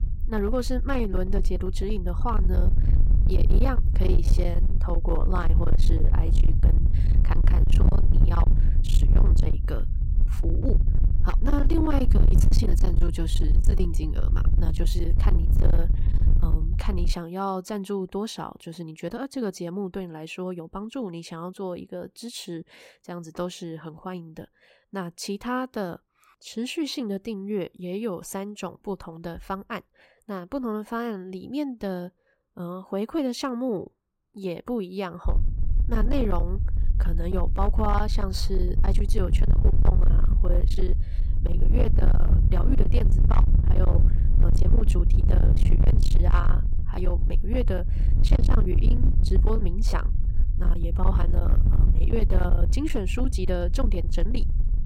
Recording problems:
distortion; heavy; 16% of the sound clipped
low rumble; loud; until 17 s and from 35 s on; 7 dB below the speech

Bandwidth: 16 kHz